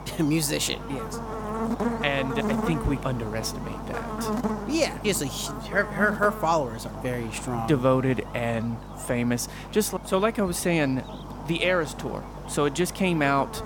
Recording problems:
electrical hum; loud; throughout; 50 Hz, 9 dB below the speech

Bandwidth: 17.5 kHz